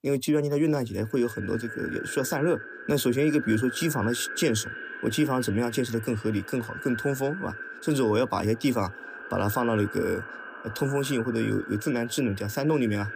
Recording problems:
echo of what is said; strong; throughout; 290 ms later, 10 dB below the speech

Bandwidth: 15 kHz